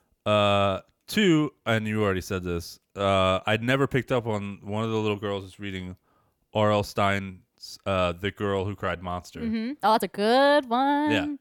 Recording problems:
uneven, jittery; strongly; from 1.5 to 11 s

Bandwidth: 18.5 kHz